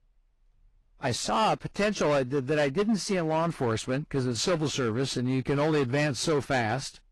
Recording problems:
distortion; slight; 9% of the sound clipped
garbled, watery; slightly

